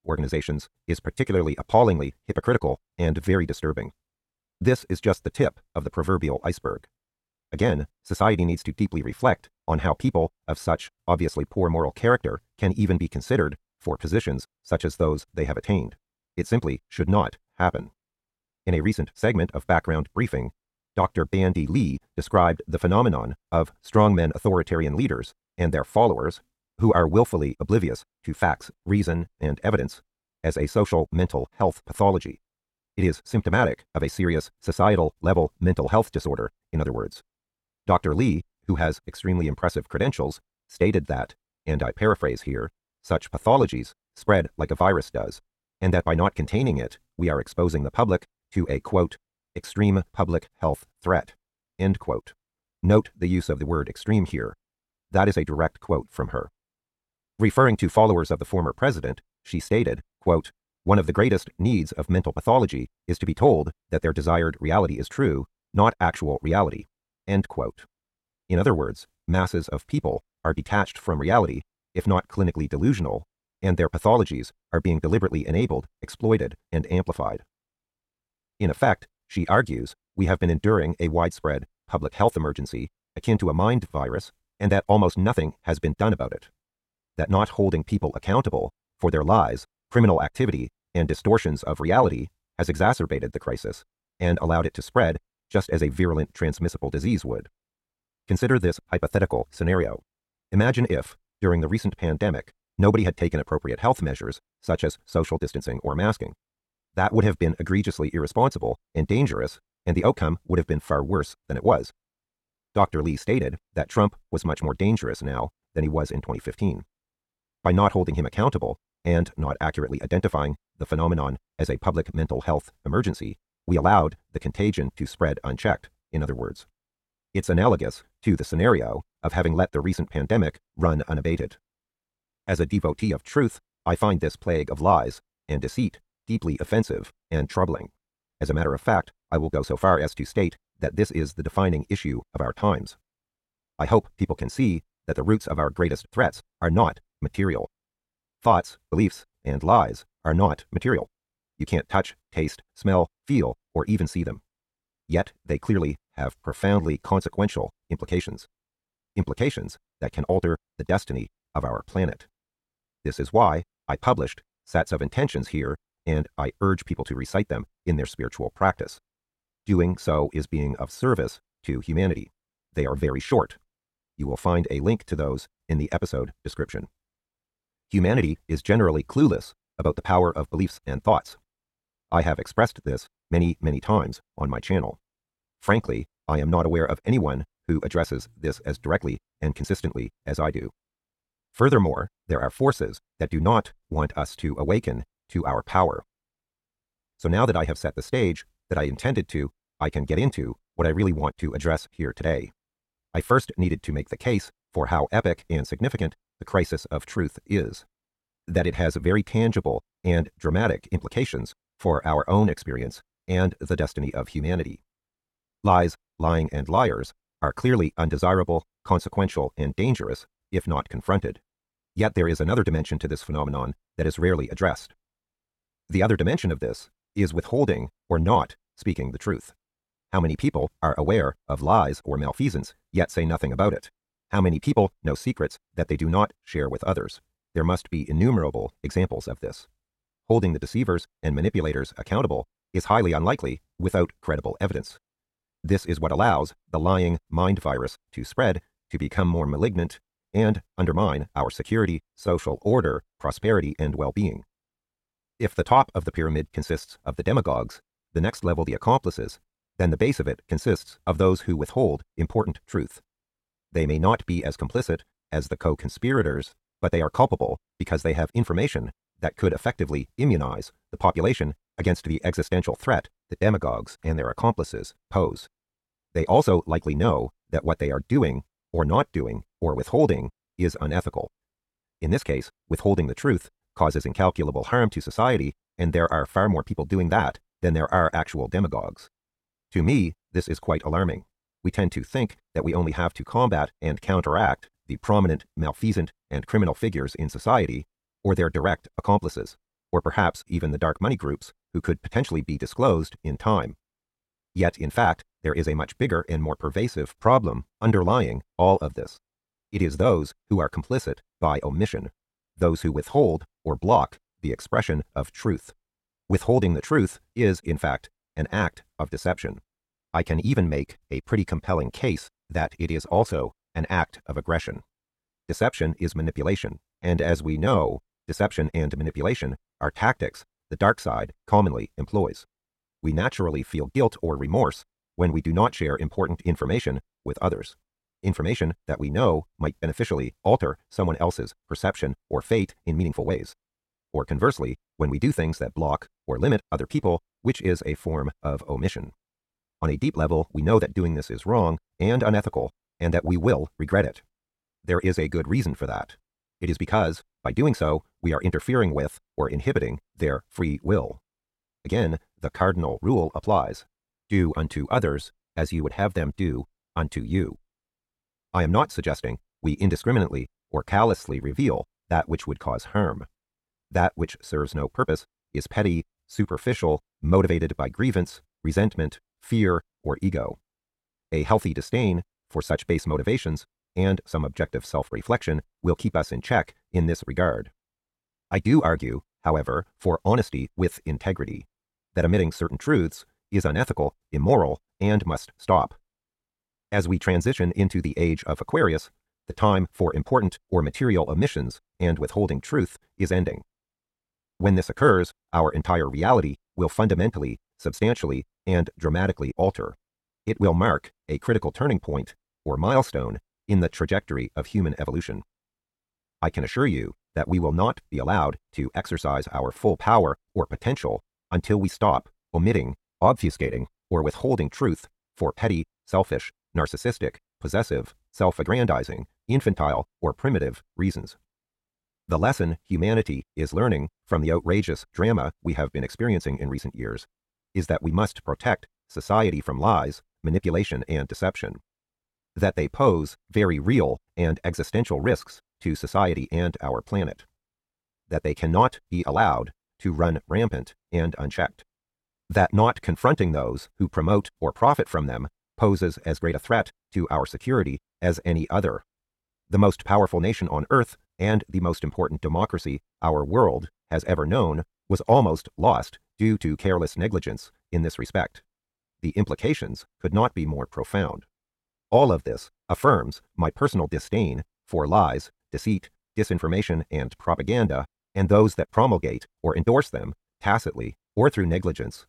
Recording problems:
wrong speed, natural pitch; too fast; 1.6 times normal speed
uneven, jittery; strongly; from 2:17 to 6:17

